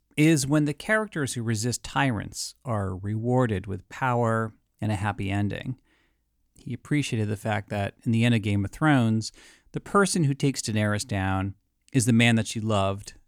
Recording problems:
none

